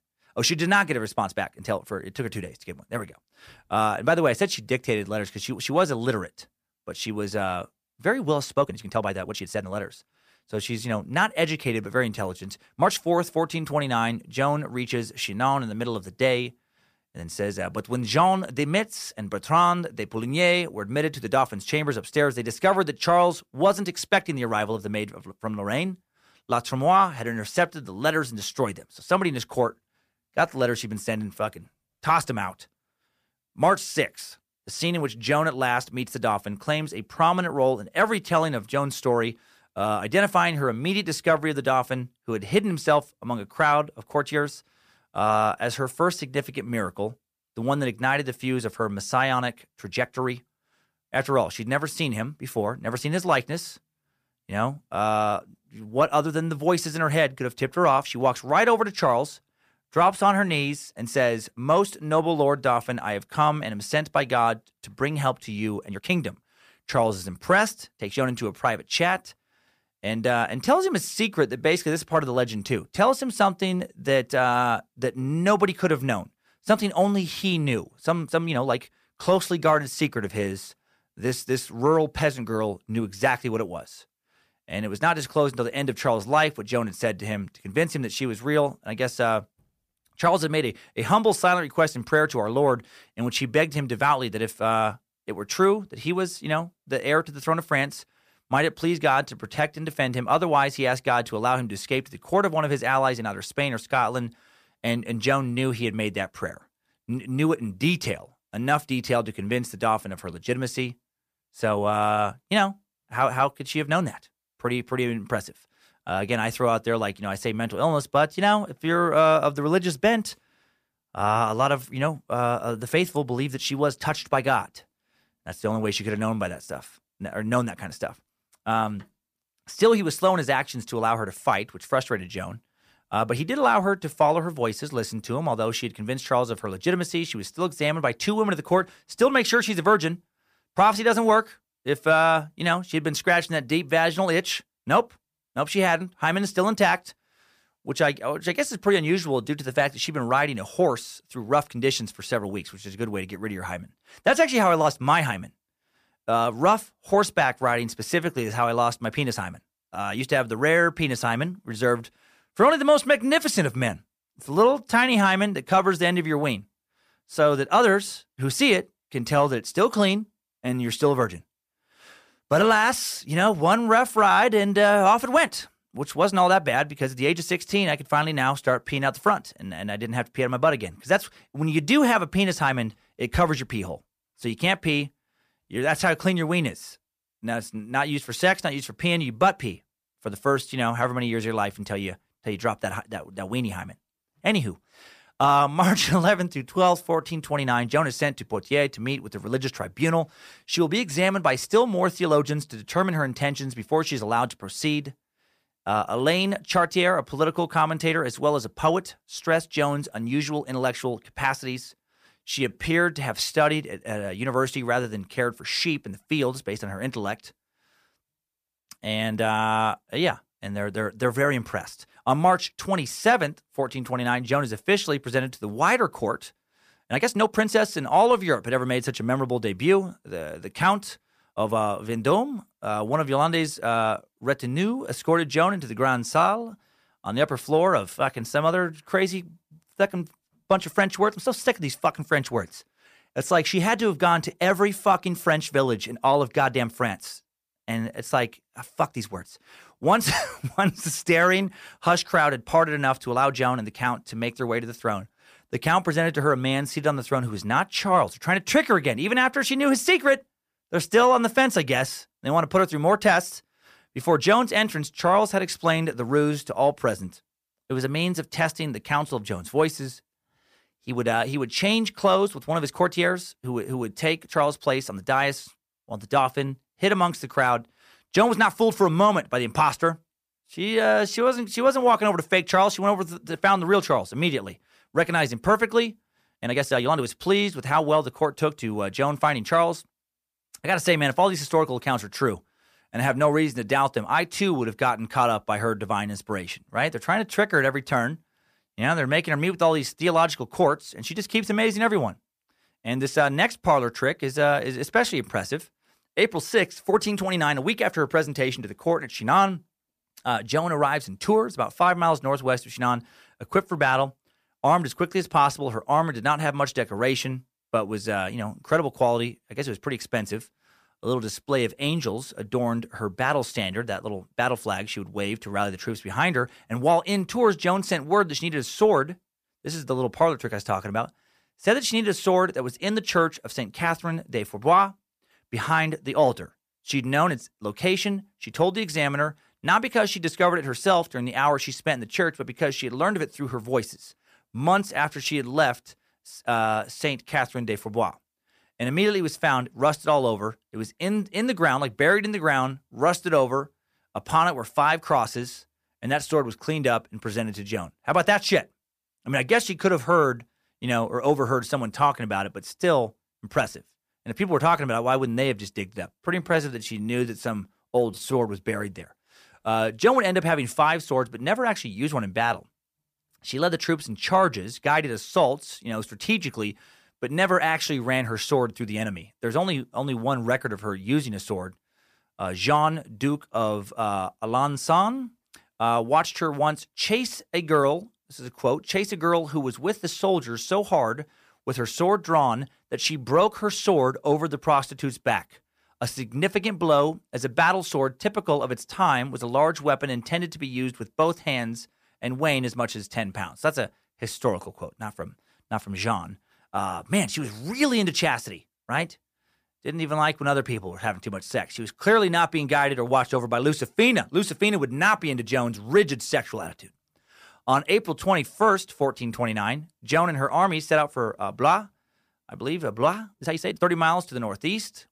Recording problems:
uneven, jittery; strongly; from 1 s to 7:04

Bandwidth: 15 kHz